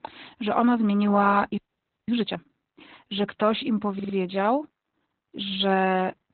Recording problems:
garbled, watery; badly; nothing above 4 kHz
audio freezing; at 1.5 s for 0.5 s
audio stuttering; at 4 s

